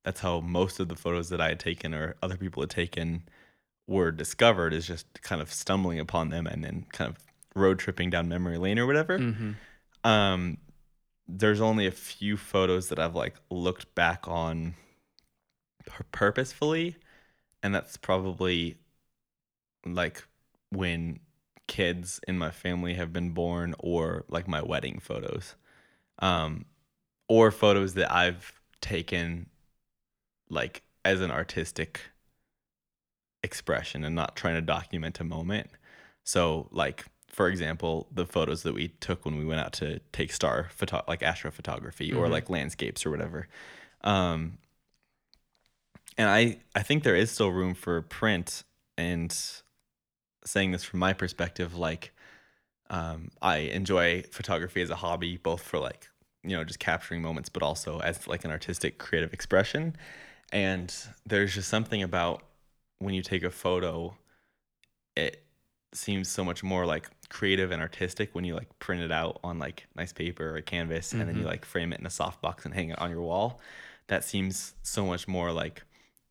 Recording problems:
none

